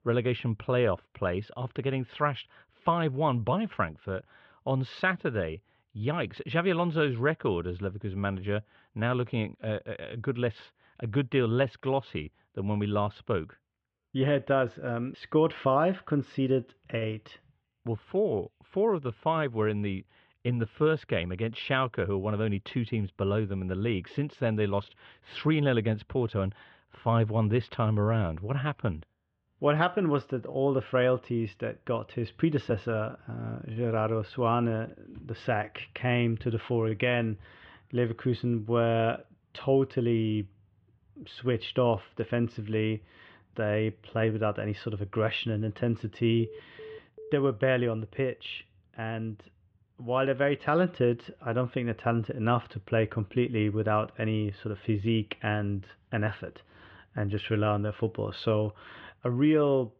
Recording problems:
muffled; very; fading above 3 kHz
phone ringing; faint; at 46 s; peak 15 dB below the speech

